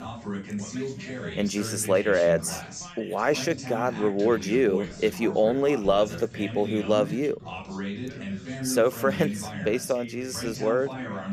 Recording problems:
background chatter; loud; throughout; 2 voices, 9 dB below the speech

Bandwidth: 14.5 kHz